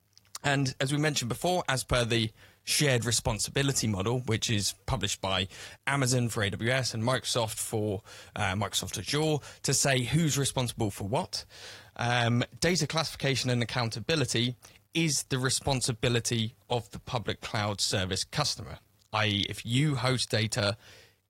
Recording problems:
garbled, watery; slightly; nothing above 15.5 kHz

